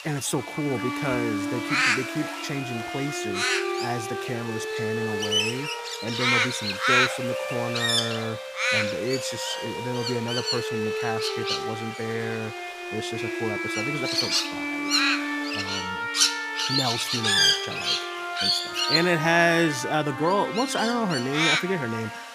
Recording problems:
animal sounds; very loud; throughout; 4 dB above the speech
background music; loud; throughout; 3 dB below the speech
high-pitched whine; faint; throughout; 4 kHz, 30 dB below the speech

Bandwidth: 15 kHz